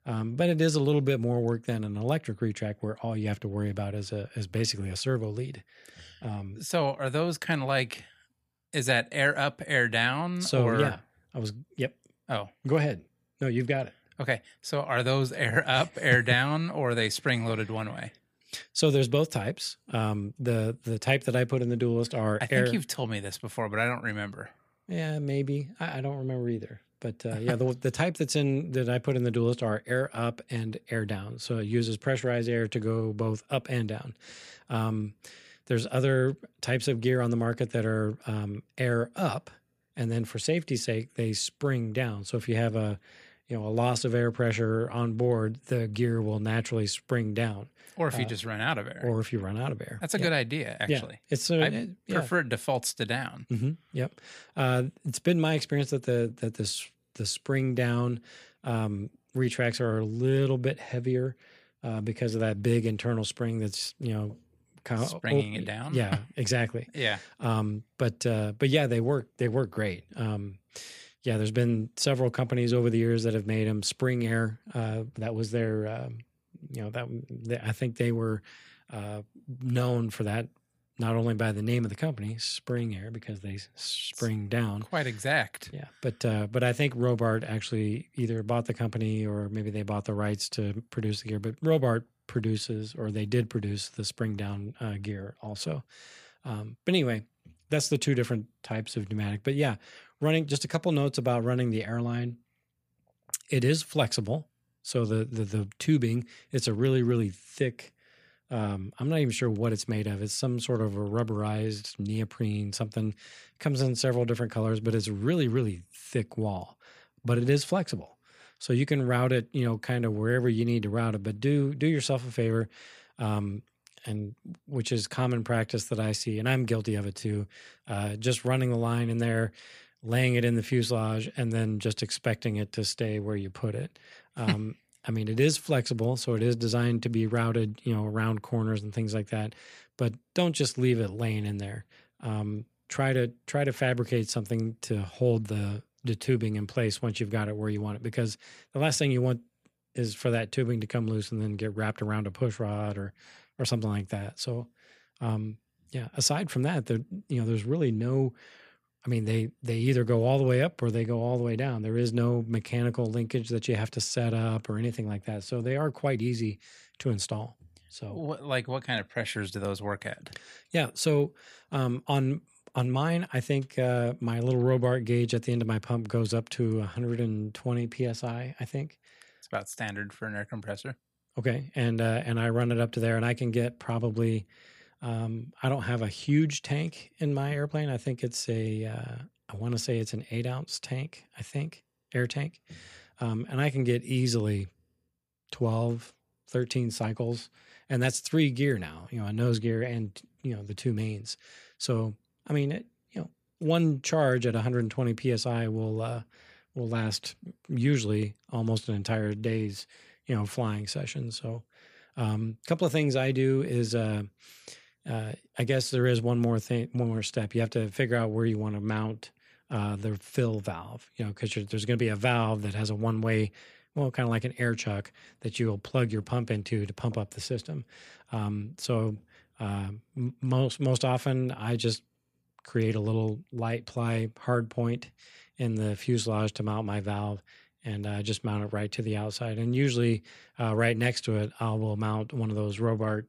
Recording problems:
none

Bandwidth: 15 kHz